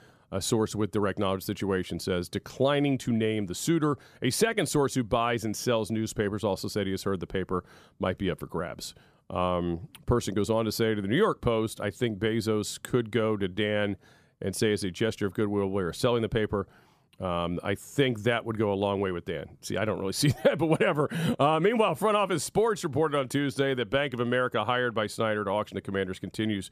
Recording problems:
none

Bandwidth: 14.5 kHz